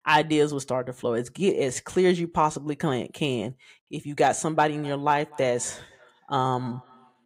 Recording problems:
echo of what is said; faint; from 4.5 s on; 250 ms later, 25 dB below the speech

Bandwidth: 15.5 kHz